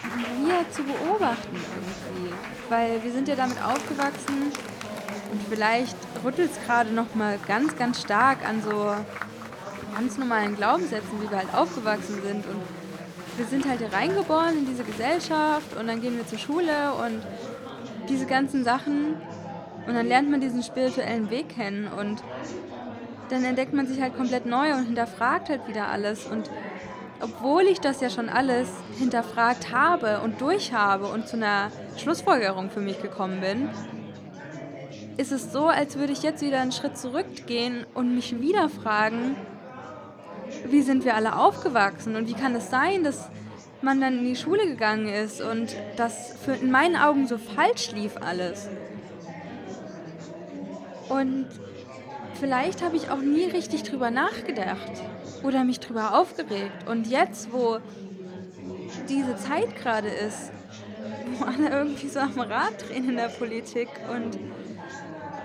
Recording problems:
murmuring crowd; noticeable; throughout; 10 dB below the speech

